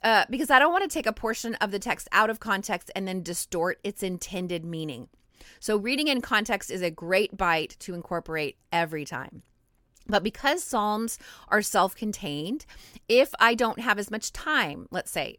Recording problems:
none

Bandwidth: 18 kHz